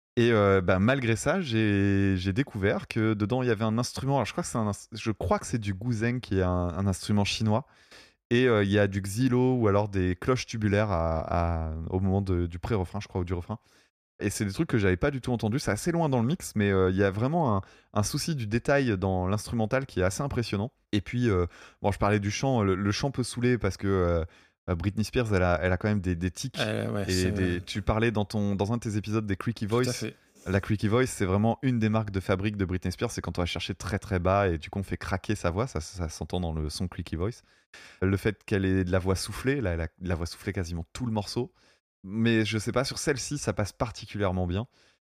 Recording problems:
none

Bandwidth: 15 kHz